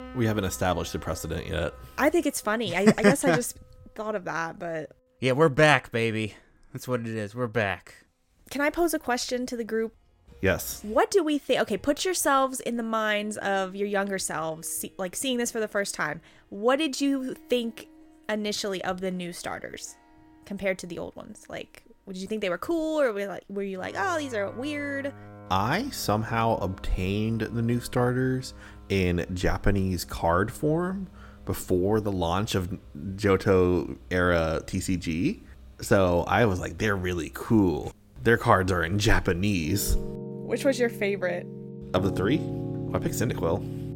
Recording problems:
background music; noticeable; throughout; 15 dB below the speech

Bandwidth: 16.5 kHz